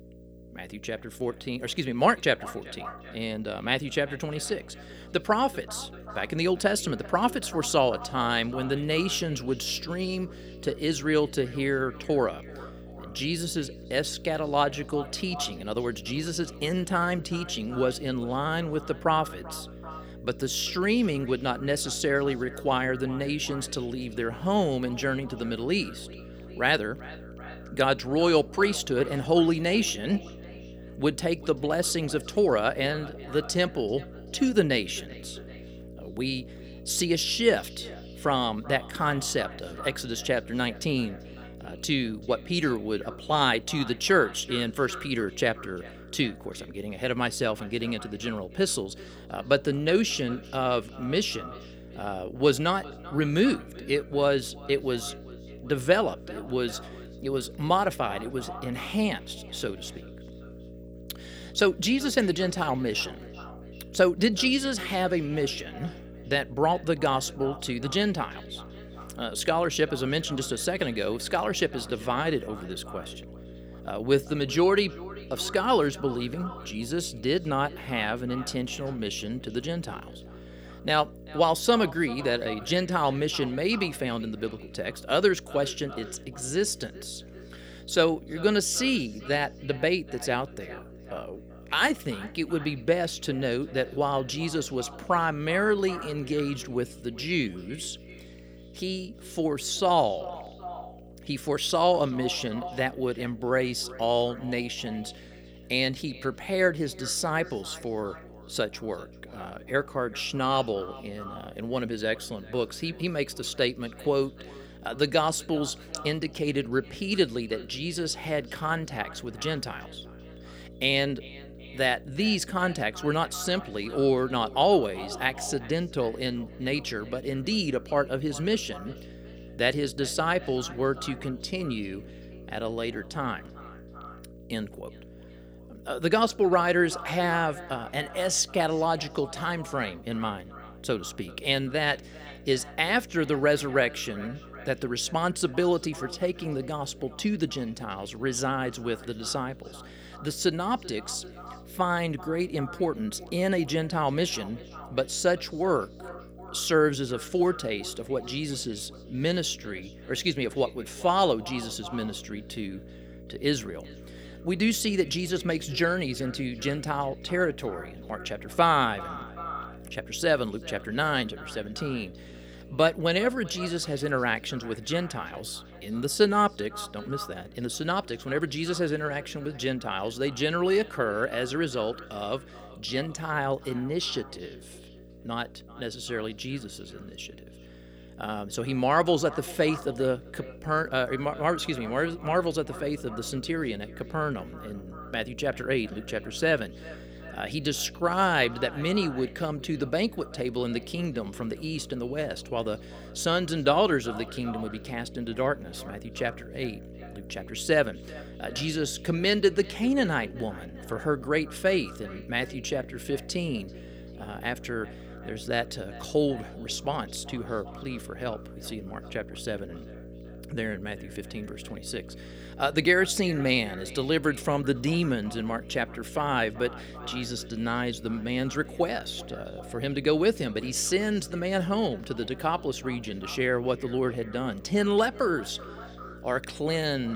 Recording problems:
echo of what is said; faint; throughout; 390 ms later, 20 dB below the speech
electrical hum; faint; throughout; 60 Hz, 25 dB below the speech
abrupt cut into speech; at the end

